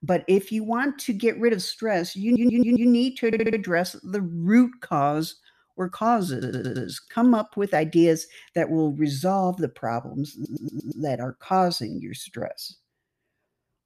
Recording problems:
audio stuttering; 4 times, first at 2 s

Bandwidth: 14.5 kHz